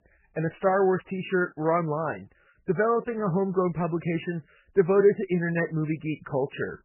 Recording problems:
garbled, watery; badly; nothing above 3 kHz

